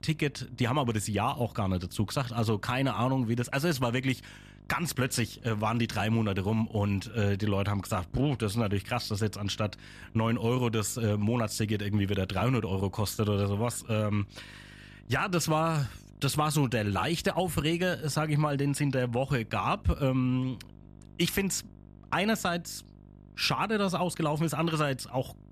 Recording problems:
electrical hum; faint; throughout; 50 Hz, 30 dB below the speech

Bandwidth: 14.5 kHz